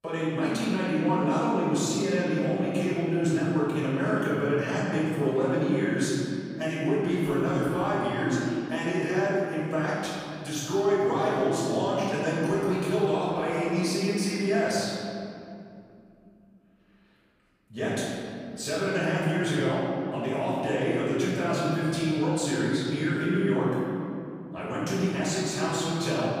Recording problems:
room echo; strong; dies away in 2.5 s
off-mic speech; far

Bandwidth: 15 kHz